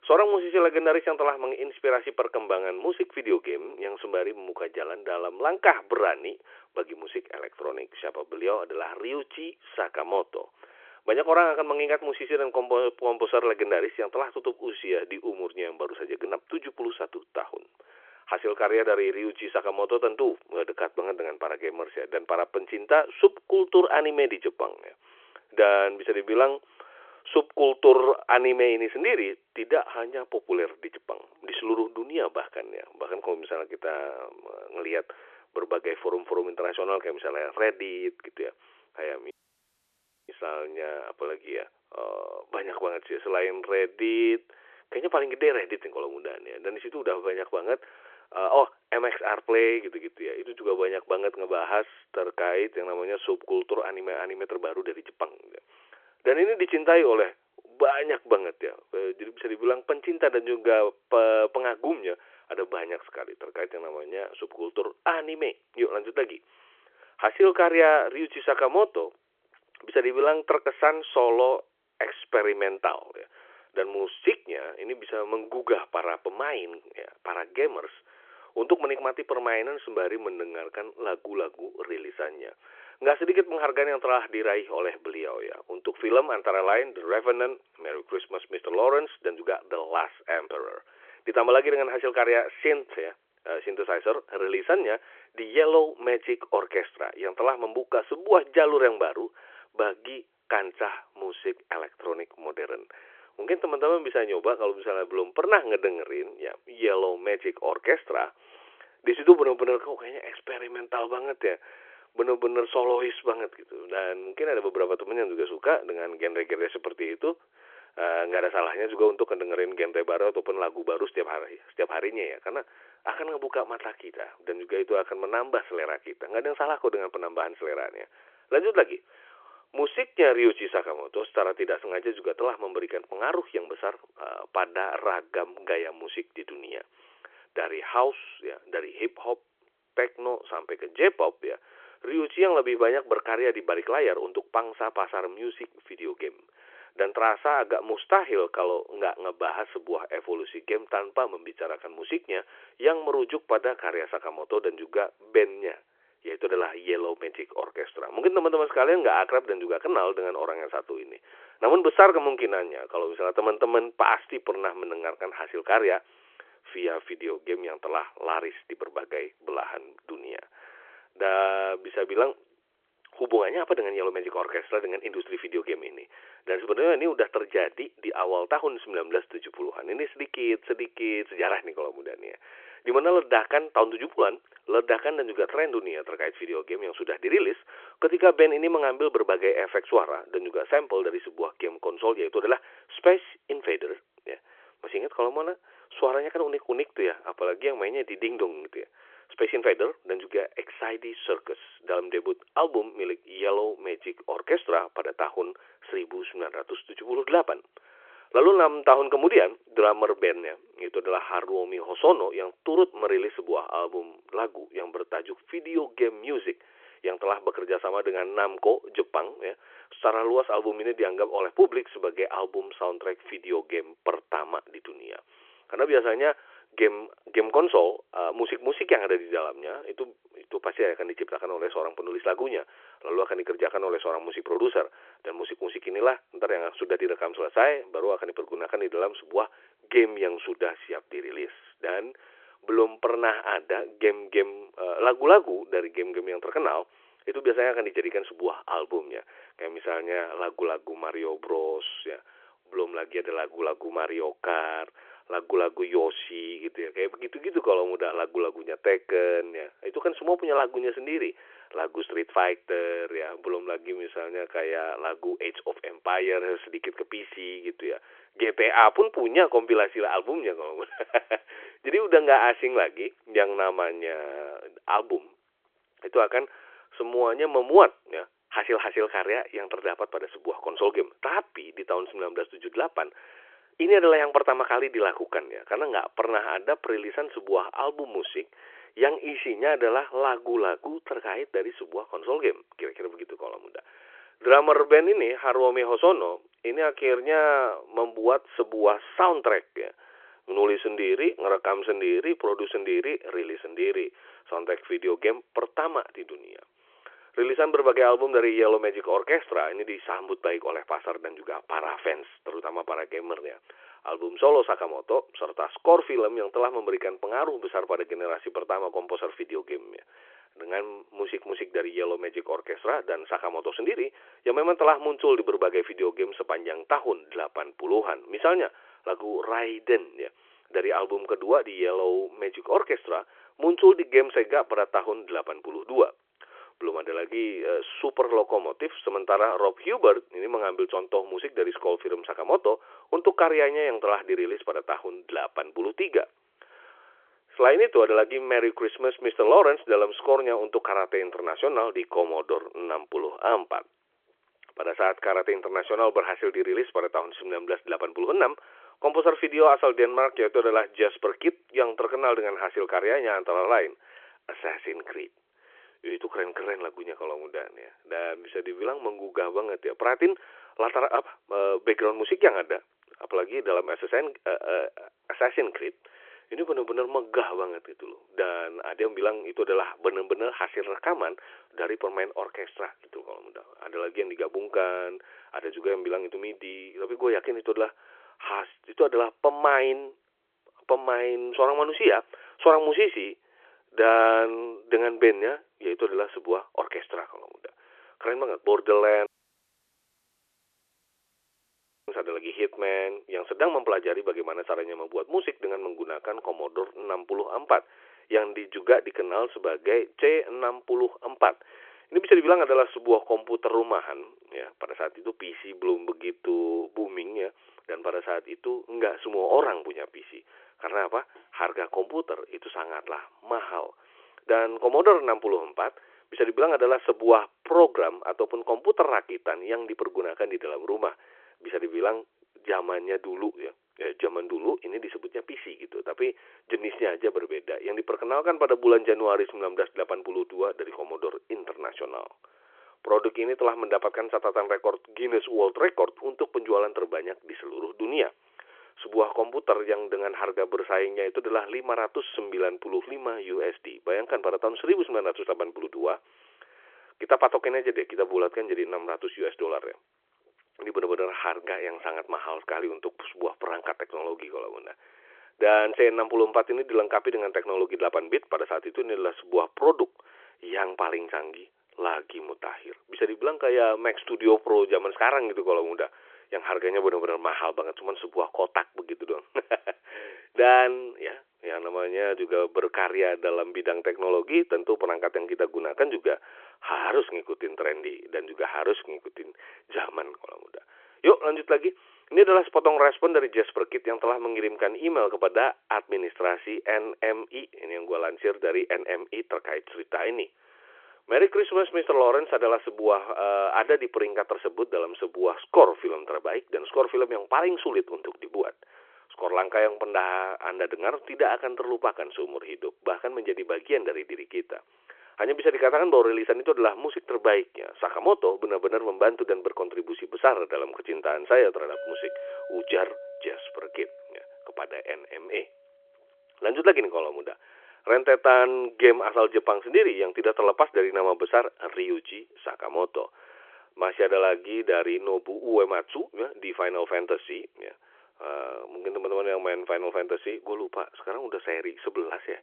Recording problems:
phone-call audio
audio cutting out; at 39 s for 1 s and at 6:39 for 3 s
clattering dishes; noticeable; from 8:42 to 8:45; peak 10 dB below the speech

